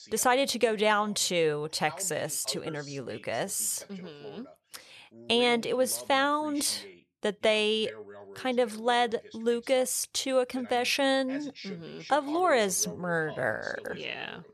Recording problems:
voice in the background; noticeable; throughout; 20 dB below the speech

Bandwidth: 13.5 kHz